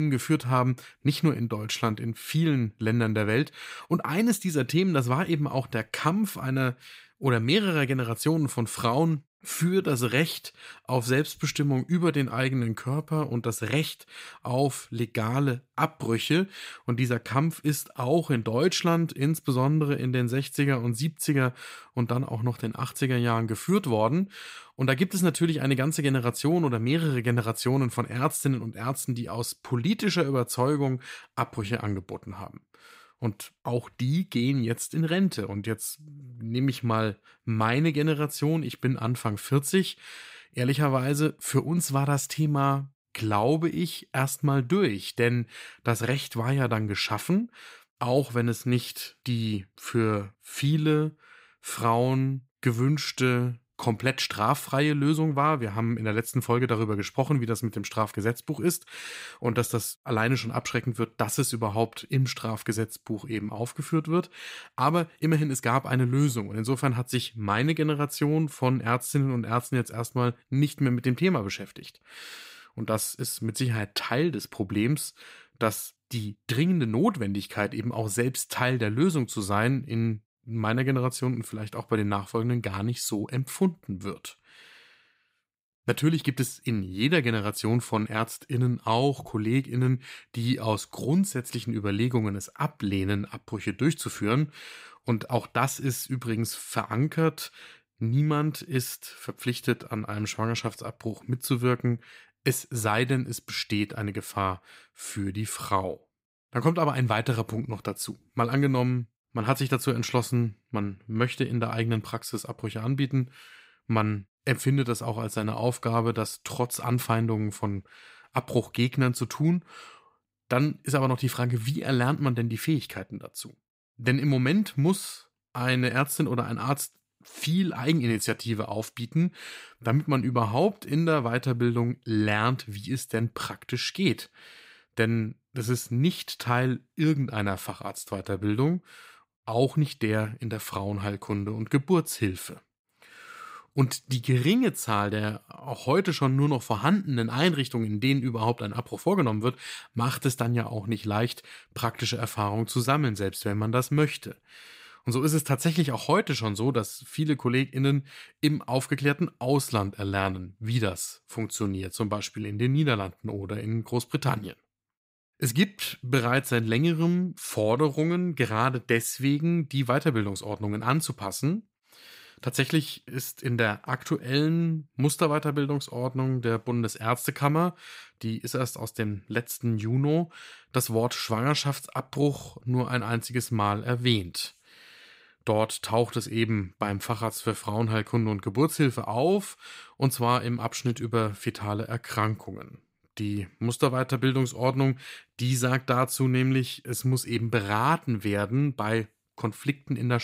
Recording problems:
abrupt cut into speech; at the start and the end

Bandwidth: 15.5 kHz